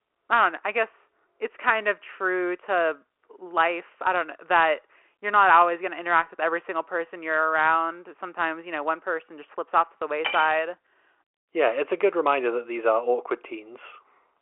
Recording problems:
phone-call audio
clattering dishes; noticeable; at 10 s; peak 5 dB below the speech

